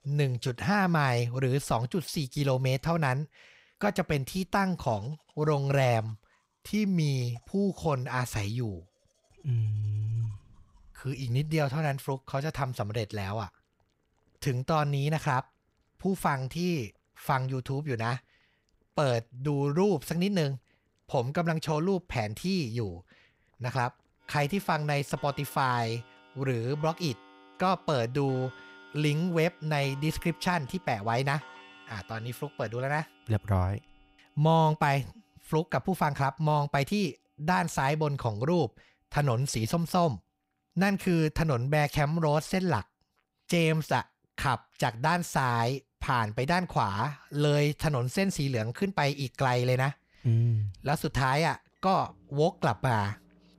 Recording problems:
household noises; faint; throughout; 25 dB below the speech

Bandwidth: 15.5 kHz